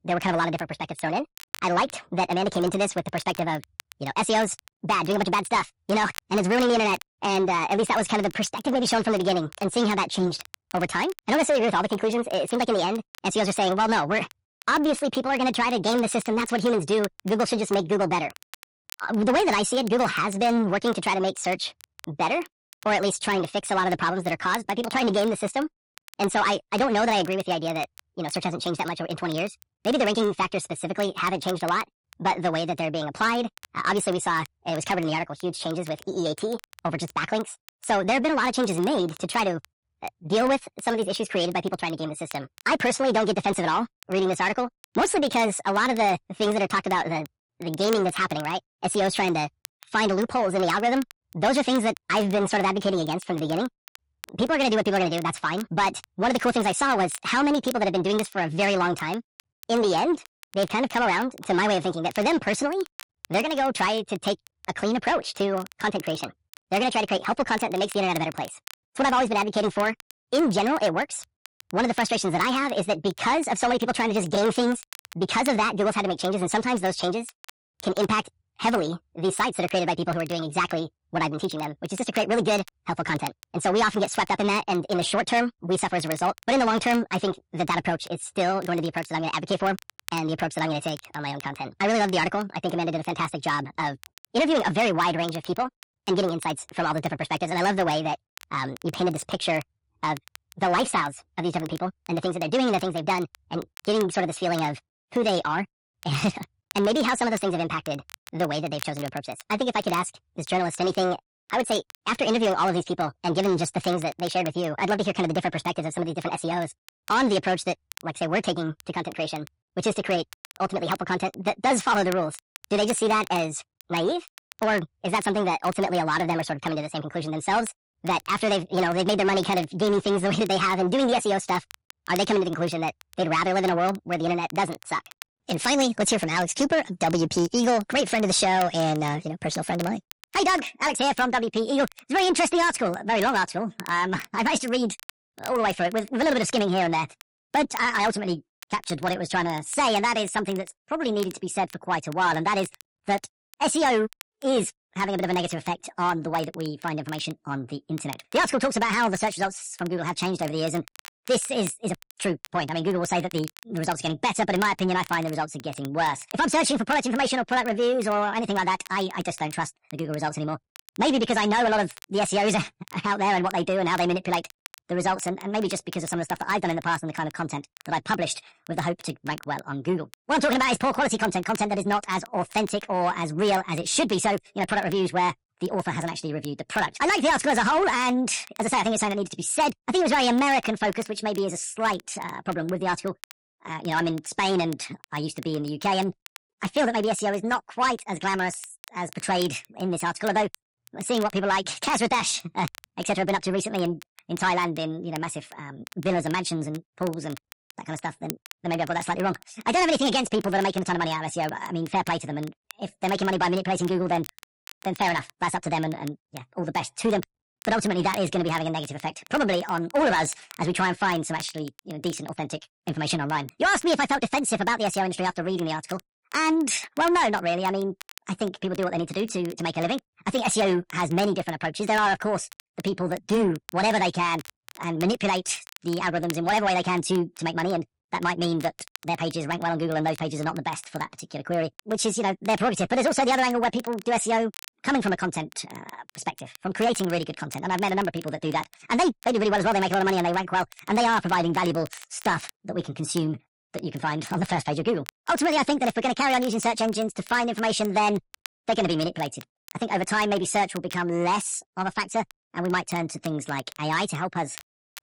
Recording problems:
wrong speed and pitch; too fast and too high; 1.5 times normal speed
distortion; slight; 10 dB below the speech
garbled, watery; slightly; nothing above 11 kHz
crackle, like an old record; faint; 20 dB below the speech

